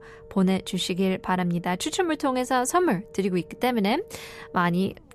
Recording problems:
low rumble; faint; throughout; 20 dB below the speech

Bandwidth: 13.5 kHz